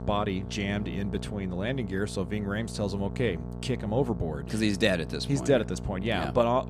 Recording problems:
electrical hum; noticeable; throughout; 60 Hz, 15 dB below the speech

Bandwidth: 14 kHz